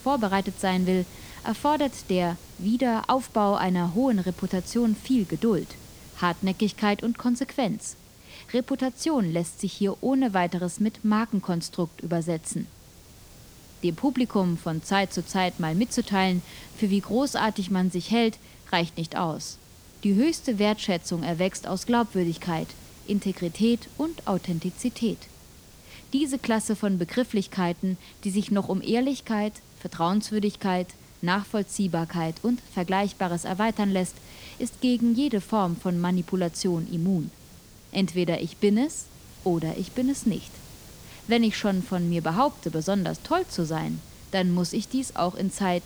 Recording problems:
hiss; faint; throughout; 20 dB below the speech

